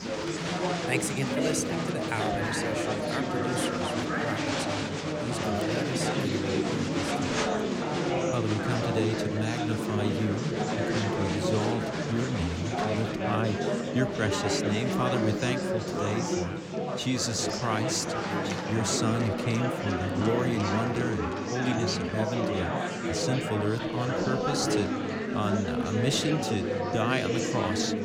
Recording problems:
chatter from many people; very loud; throughout; 2 dB above the speech

